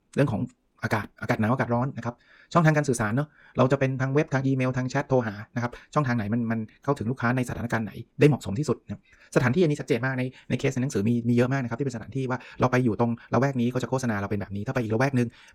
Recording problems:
wrong speed, natural pitch; too fast; 1.5 times normal speed

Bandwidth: 17.5 kHz